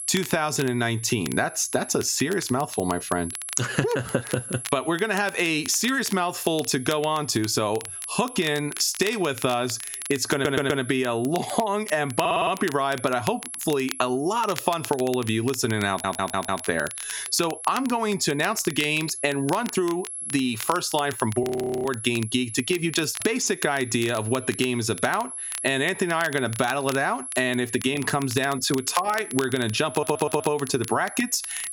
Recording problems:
squashed, flat; somewhat
high-pitched whine; noticeable; throughout; 11 kHz, 10 dB below the speech
crackle, like an old record; noticeable; 15 dB below the speech
audio stuttering; 4 times, first at 10 s
audio freezing; at 21 s

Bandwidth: 16.5 kHz